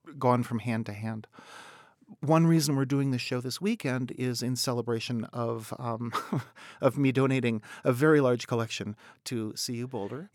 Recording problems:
none

